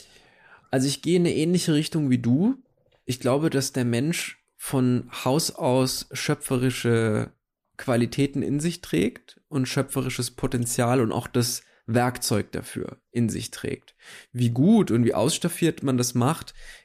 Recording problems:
none

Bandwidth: 14.5 kHz